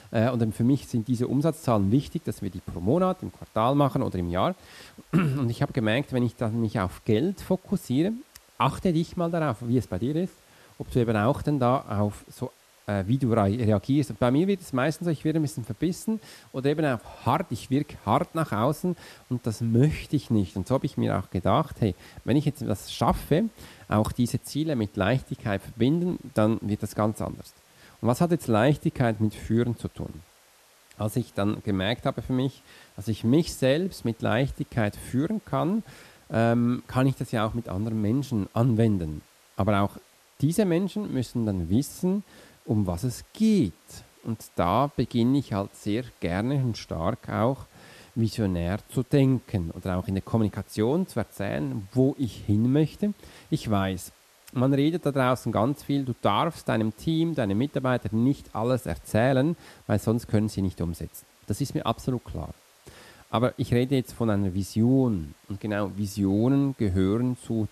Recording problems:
hiss; faint; throughout; 30 dB below the speech

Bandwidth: 13.5 kHz